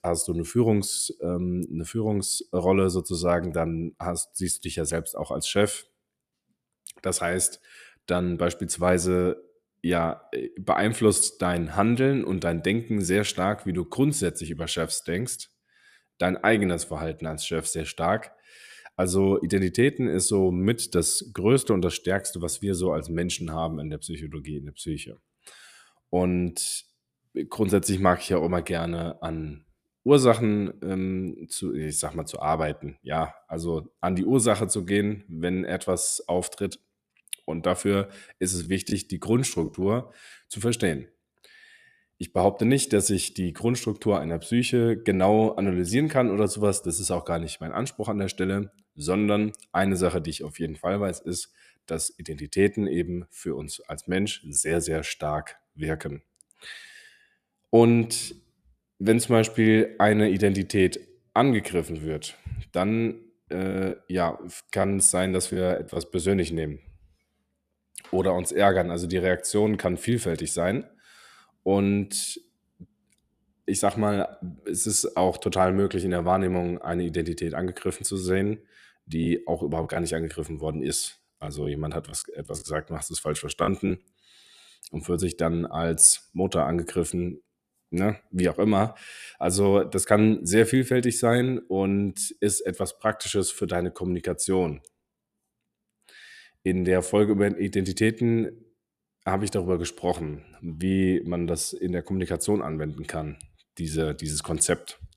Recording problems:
choppy; very; from 39 to 40 s, from 1:04 to 1:06 and from 1:19 to 1:24; 7% of the speech affected

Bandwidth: 14.5 kHz